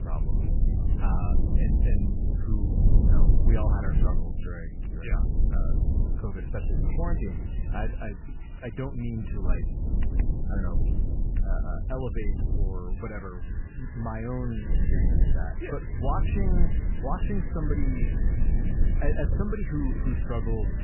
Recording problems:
garbled, watery; badly; nothing above 3 kHz
low rumble; loud; throughout; 4 dB below the speech
household noises; noticeable; throughout; 15 dB below the speech

